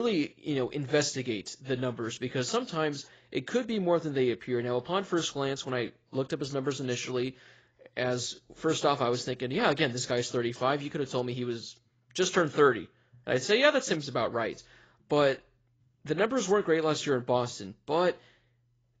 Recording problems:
garbled, watery; badly; nothing above 7.5 kHz
abrupt cut into speech; at the start

